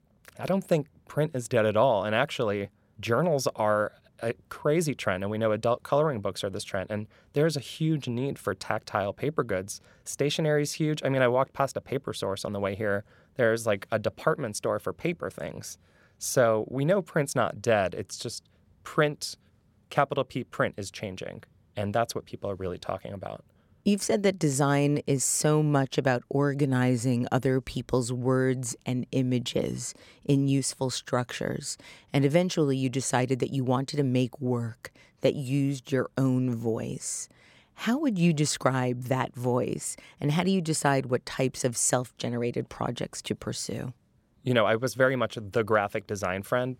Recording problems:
none

